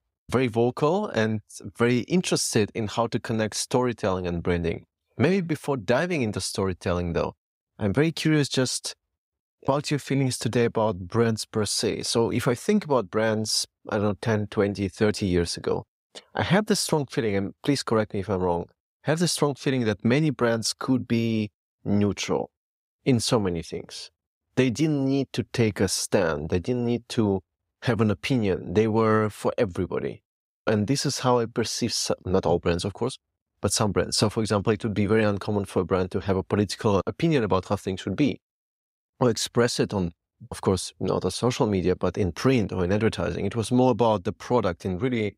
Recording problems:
none

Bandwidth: 15.5 kHz